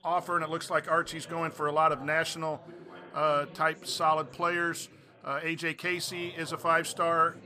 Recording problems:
background chatter; faint; throughout; 4 voices, 20 dB below the speech

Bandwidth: 15 kHz